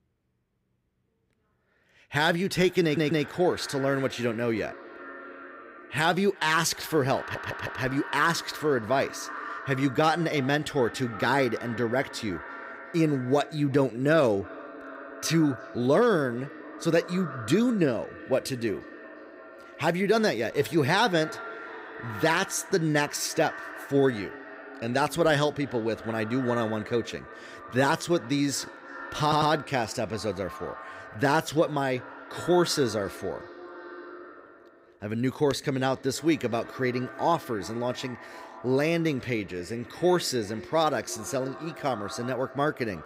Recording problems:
echo of what is said; noticeable; throughout; 350 ms later, 15 dB below the speech
audio stuttering; at 3 s, at 7 s and at 29 s

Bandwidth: 15.5 kHz